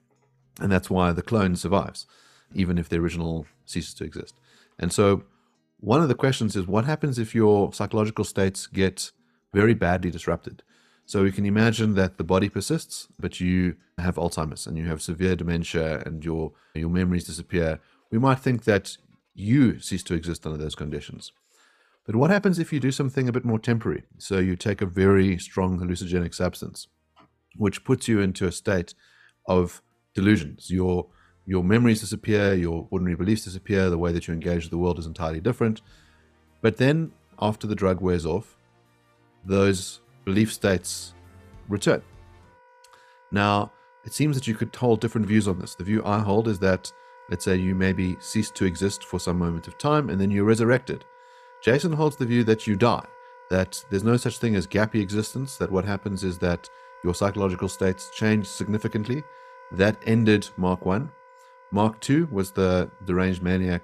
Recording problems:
background music; faint; throughout; 25 dB below the speech

